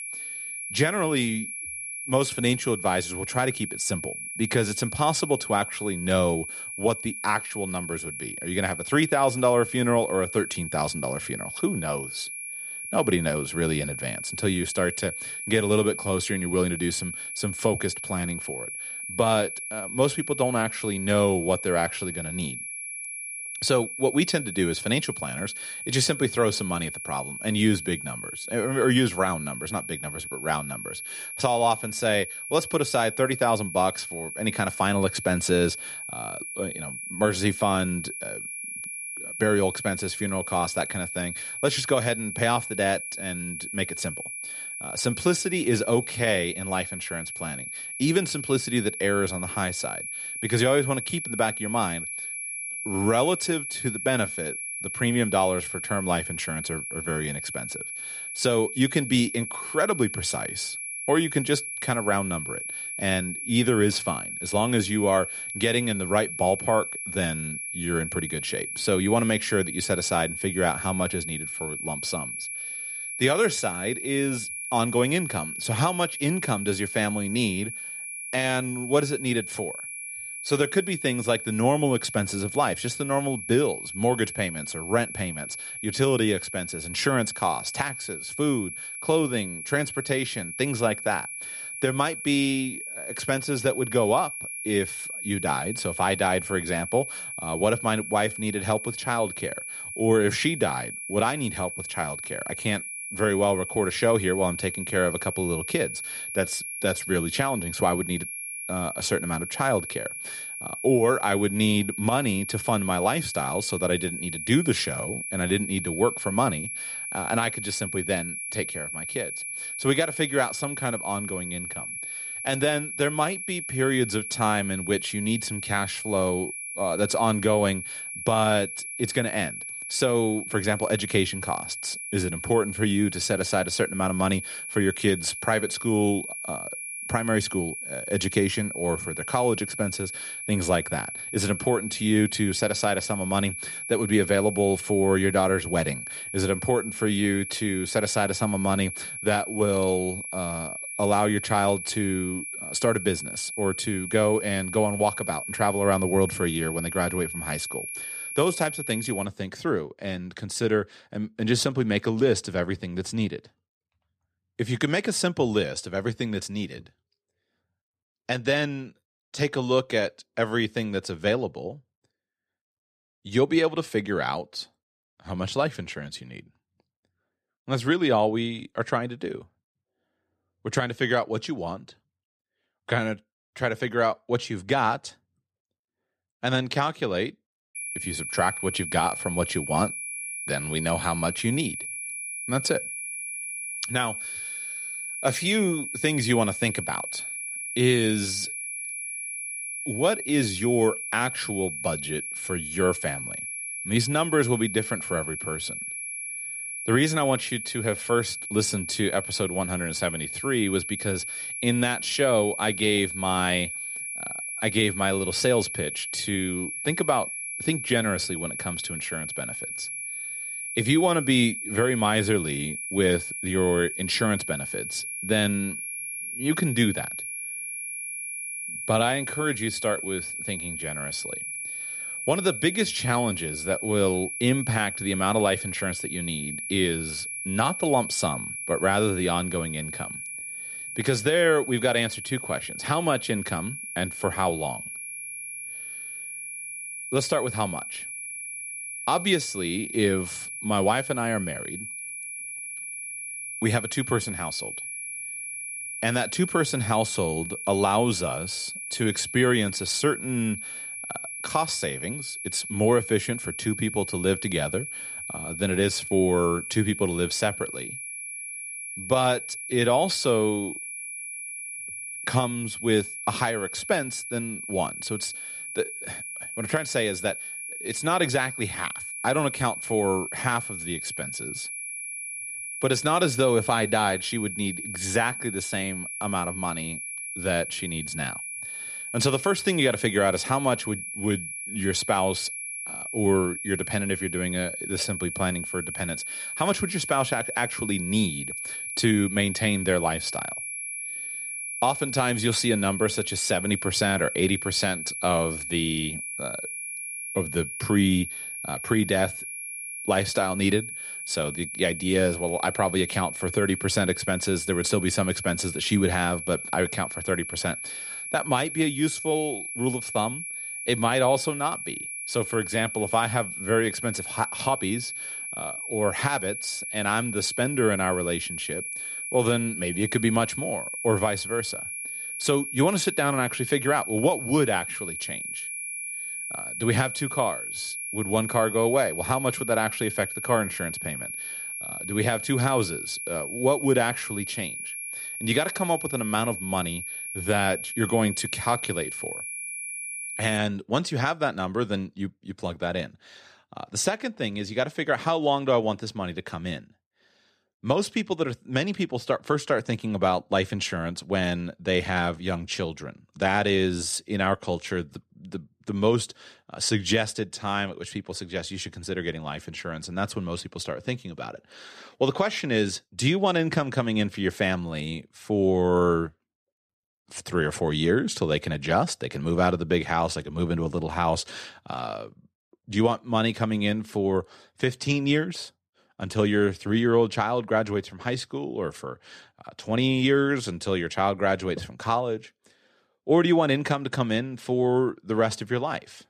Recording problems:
high-pitched whine; loud; until 2:39 and from 3:08 to 5:51; 2.5 kHz, 6 dB below the speech

